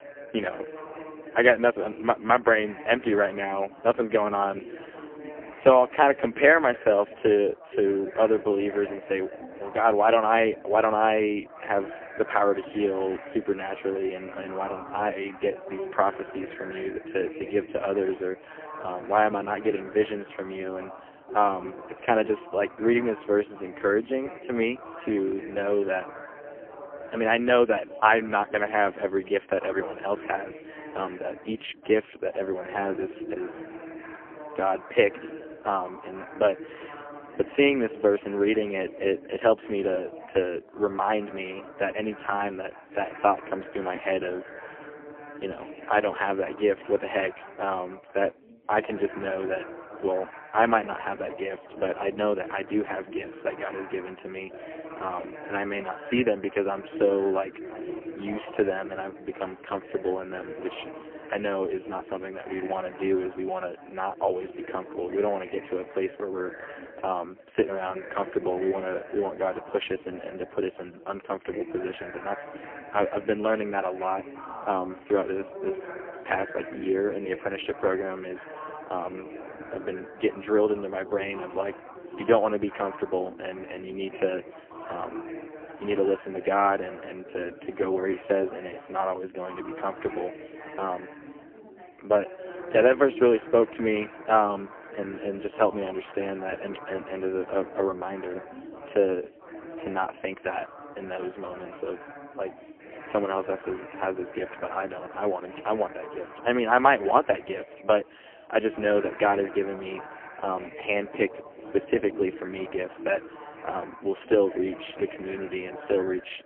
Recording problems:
phone-call audio; poor line; nothing above 3 kHz
background chatter; noticeable; throughout; 4 voices, 15 dB below the speech

